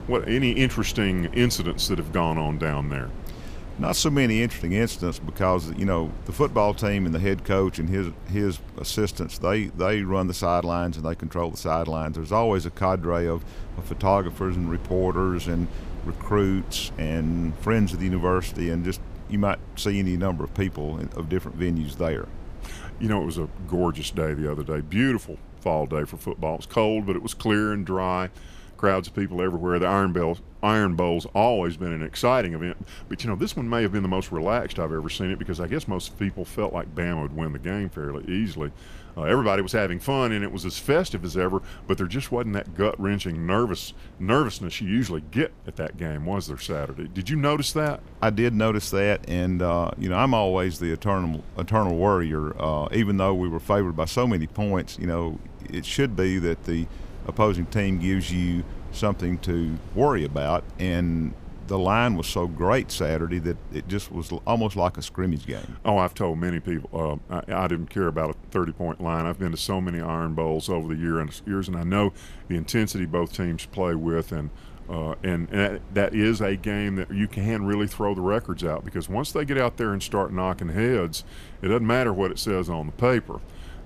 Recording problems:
wind noise on the microphone; occasional gusts; 25 dB below the speech

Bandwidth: 15 kHz